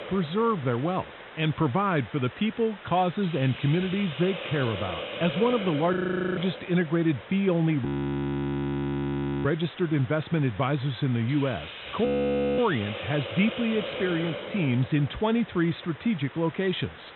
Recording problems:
high frequencies cut off; severe; nothing above 4 kHz
hiss; noticeable; throughout; 10 dB below the speech
audio freezing; at 6 s, at 8 s for 1.5 s and at 12 s for 0.5 s

